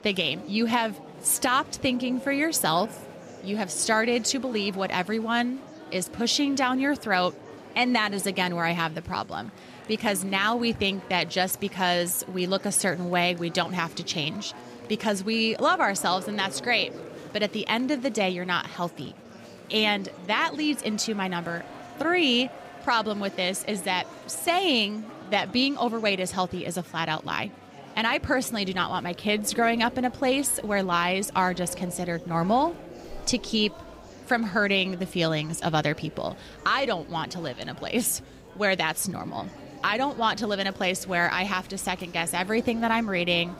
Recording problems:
murmuring crowd; noticeable; throughout; 20 dB below the speech

